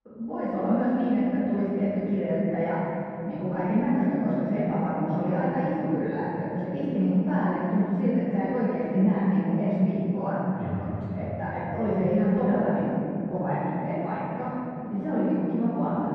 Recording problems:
room echo; strong; dies away in 3 s
off-mic speech; far
muffled; very; fading above 1 kHz

